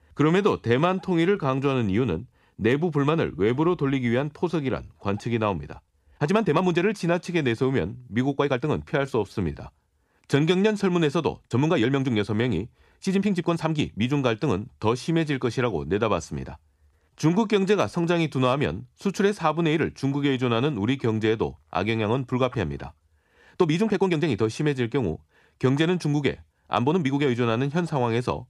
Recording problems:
uneven, jittery; strongly; from 0.5 to 27 s

